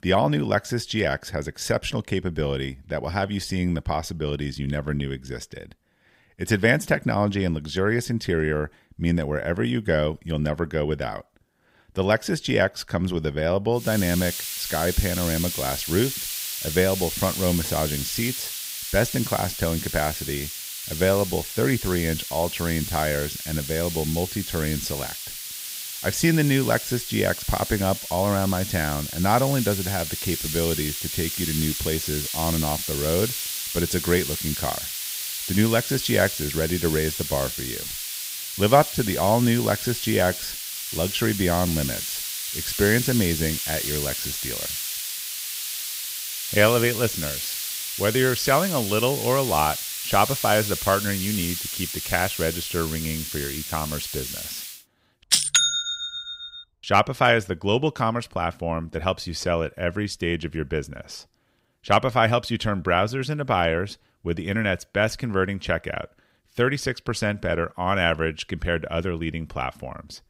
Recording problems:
hiss; loud; from 14 to 55 s; 4 dB below the speech

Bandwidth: 15.5 kHz